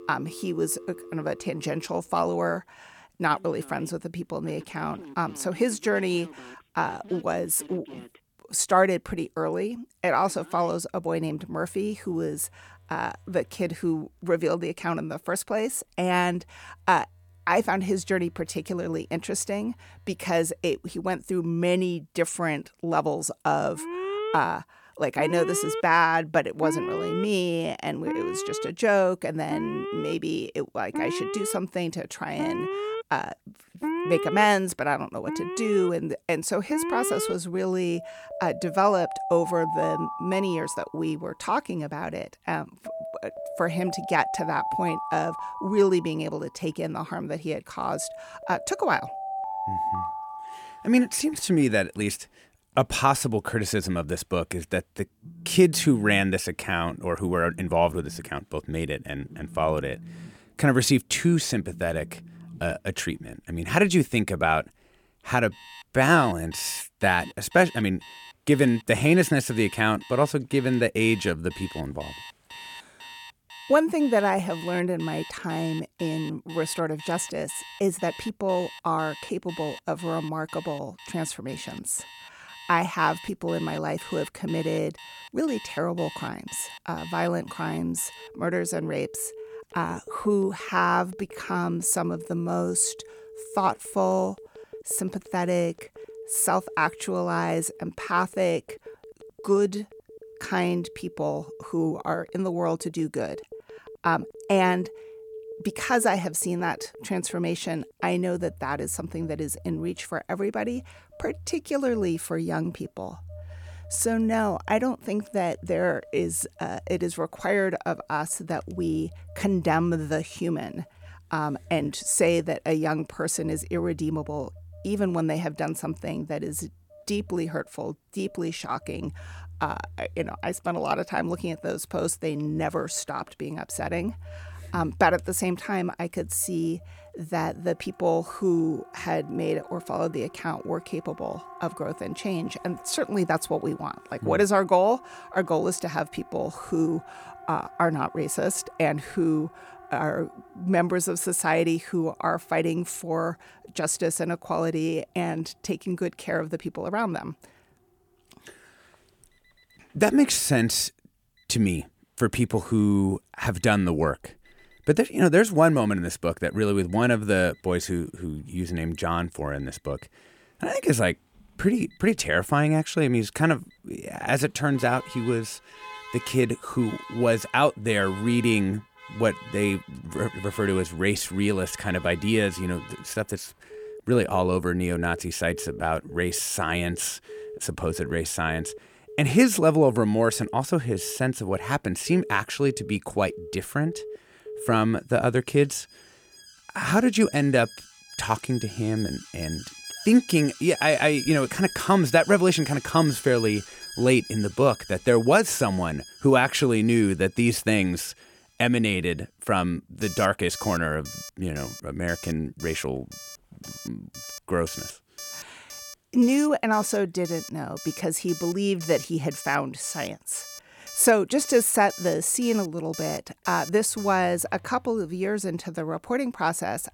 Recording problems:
alarms or sirens; noticeable; throughout; 15 dB below the speech

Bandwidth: 17.5 kHz